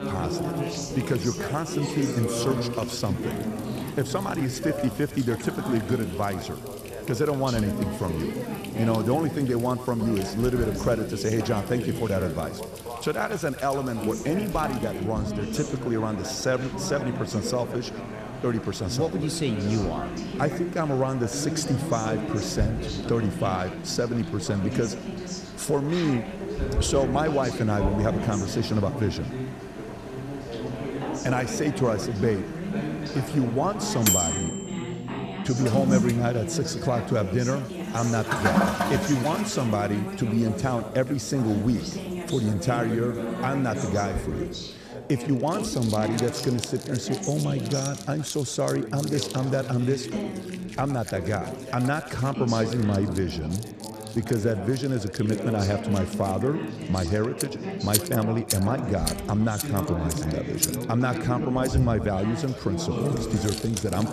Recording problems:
echo of what is said; faint; throughout; 110 ms later, 20 dB below the speech
household noises; loud; throughout; 8 dB below the speech
background chatter; loud; throughout; 3 voices, 6 dB below the speech

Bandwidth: 14.5 kHz